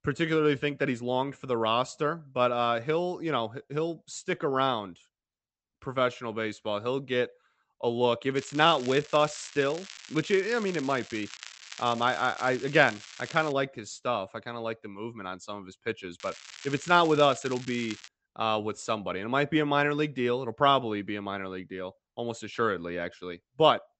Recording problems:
high frequencies cut off; noticeable; nothing above 8 kHz
crackling; noticeable; from 8.5 to 14 s and from 16 to 18 s; 15 dB below the speech

